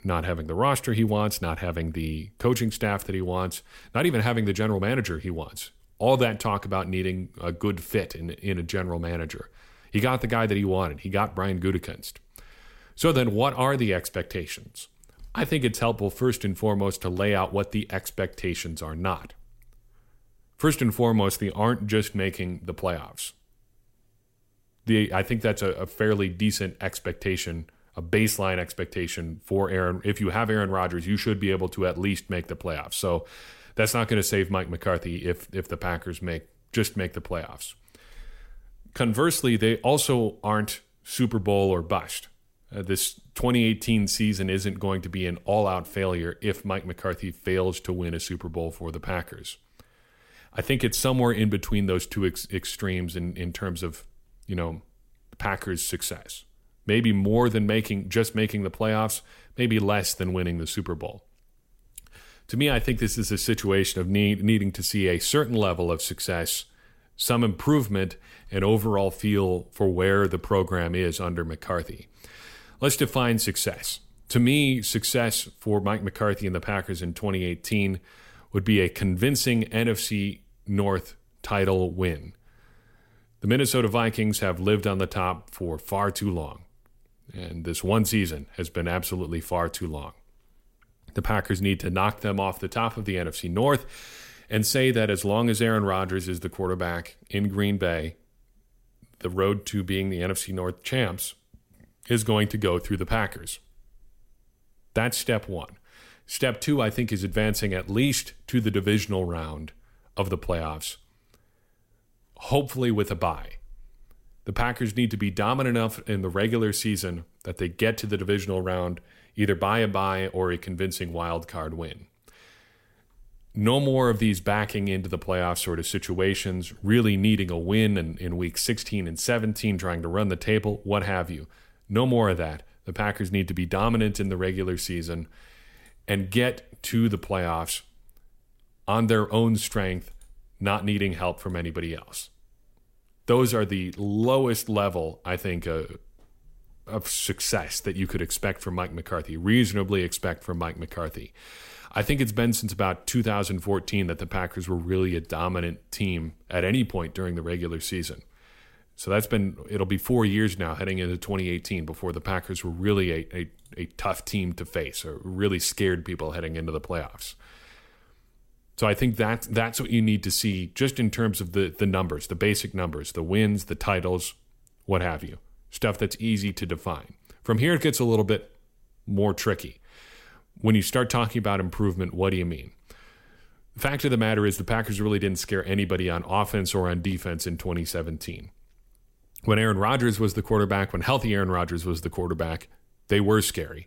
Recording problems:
none

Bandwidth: 16 kHz